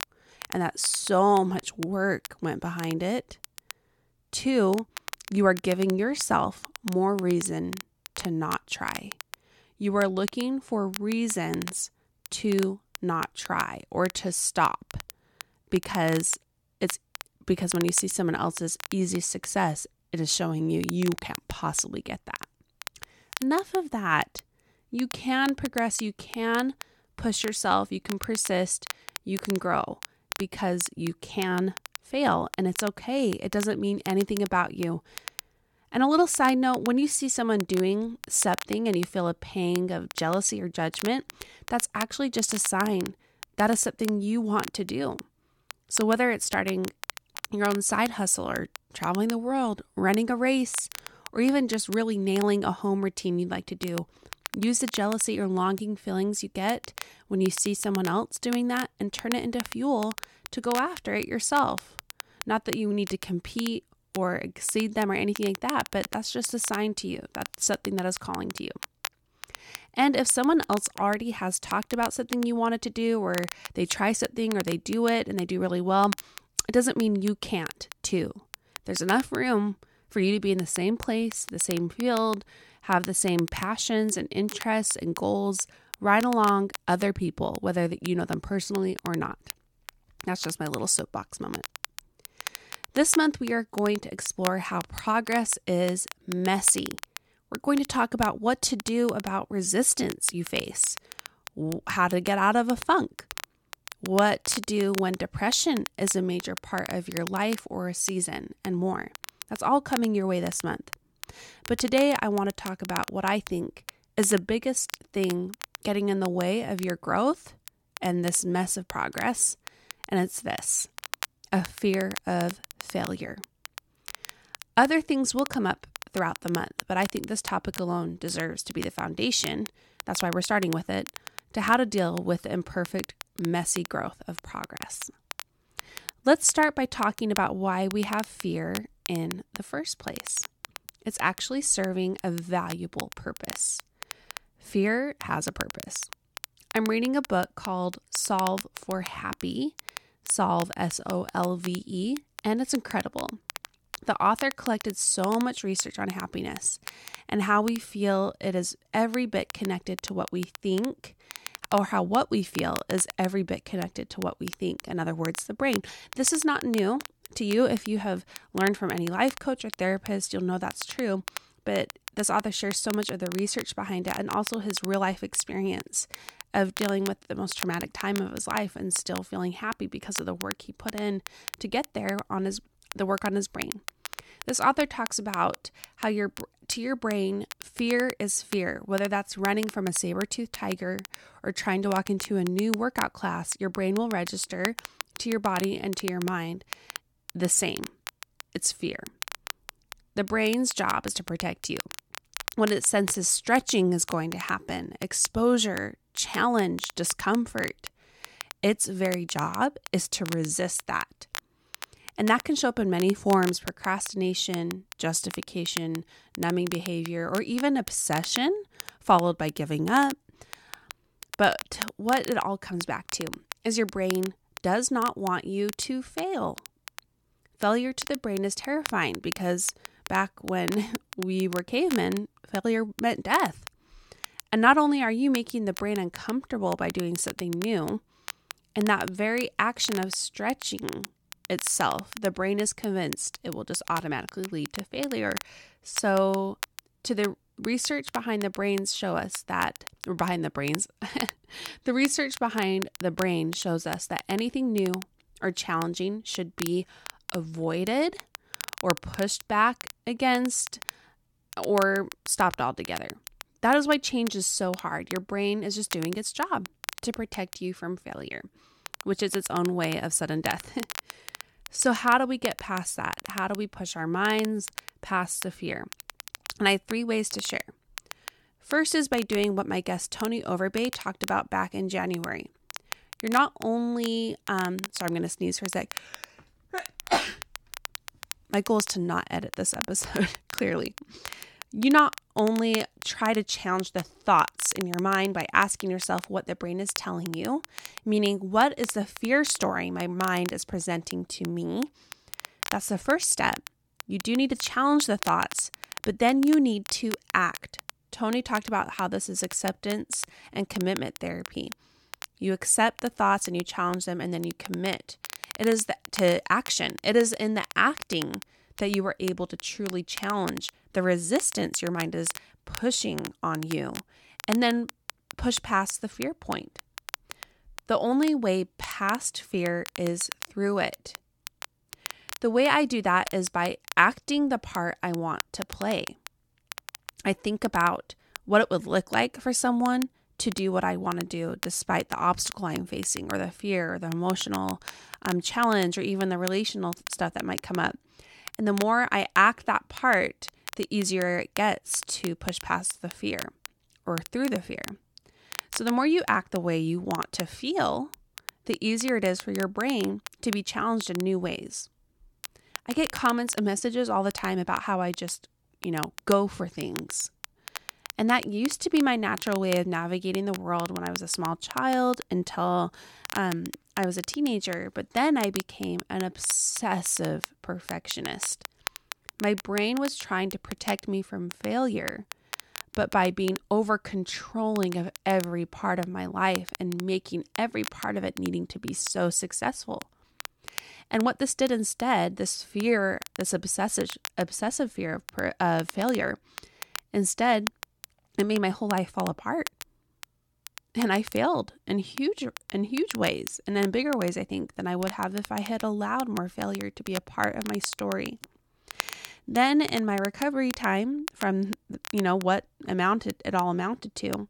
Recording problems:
crackle, like an old record; noticeable; 15 dB below the speech

